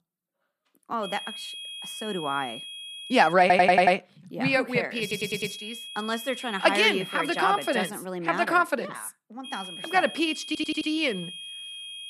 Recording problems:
high-pitched whine; noticeable; from 1 to 3.5 s, from 5 to 8 s and from 9.5 s on; 3.5 kHz, 10 dB below the speech
audio stuttering; at 3.5 s, at 5 s and at 10 s

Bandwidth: 14.5 kHz